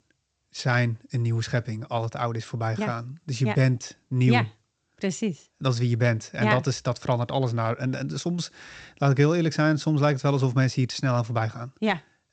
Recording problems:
garbled, watery; slightly; nothing above 7.5 kHz

